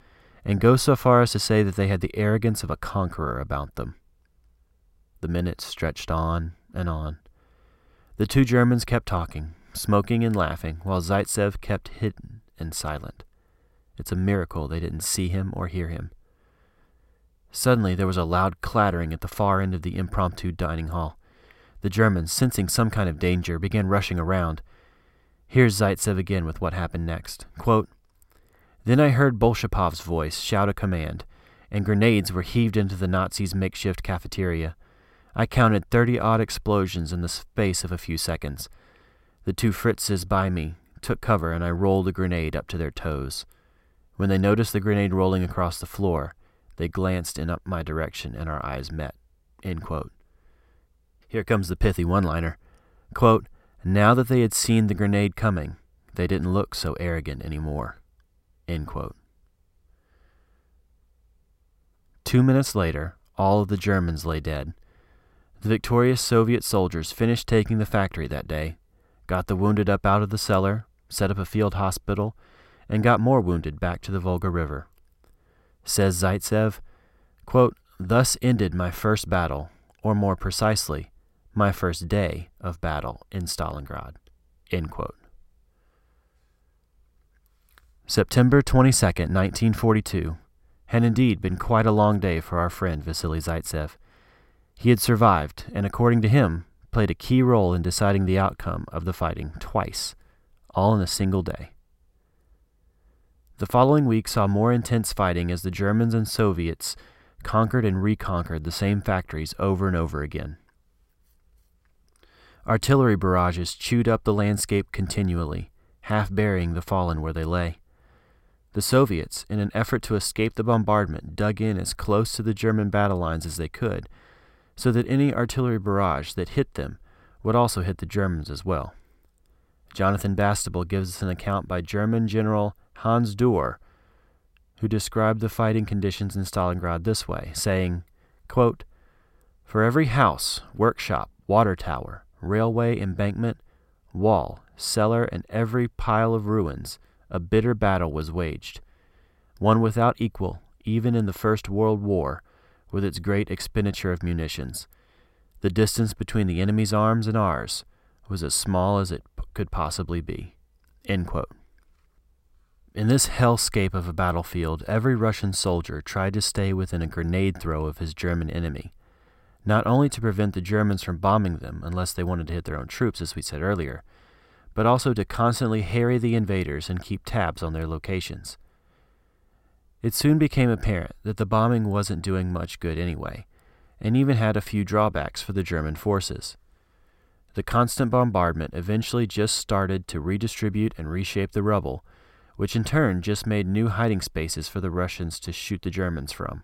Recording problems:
none

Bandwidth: 16 kHz